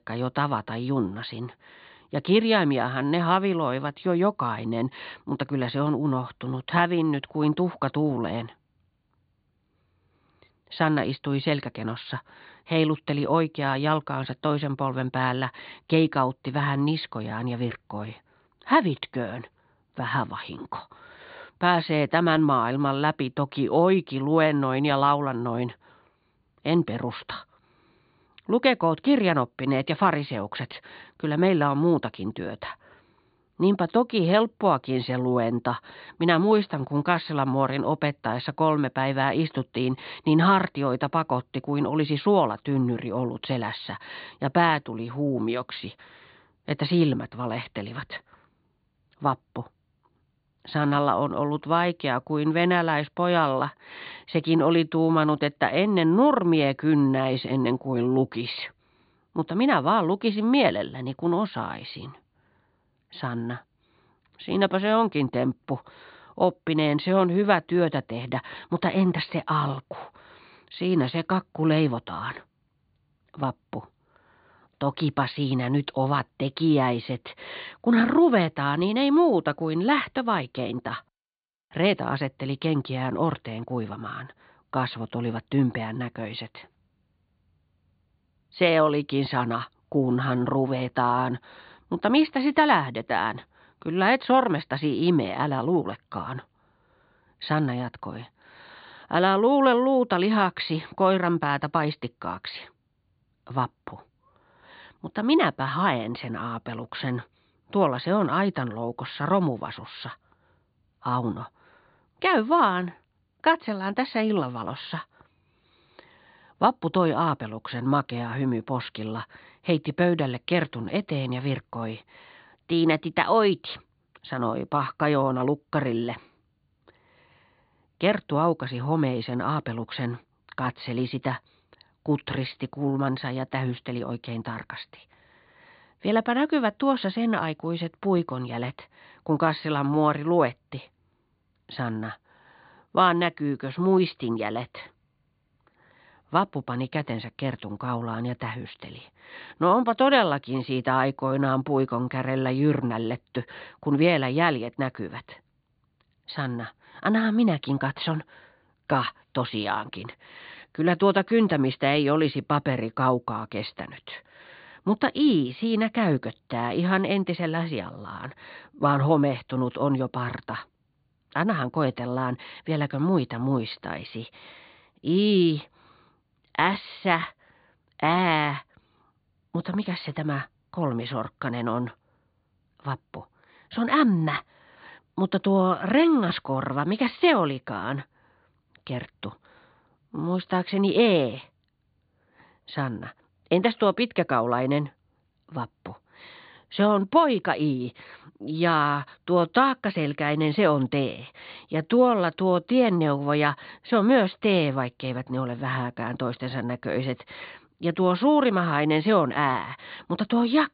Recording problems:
high frequencies cut off; severe; nothing above 4.5 kHz

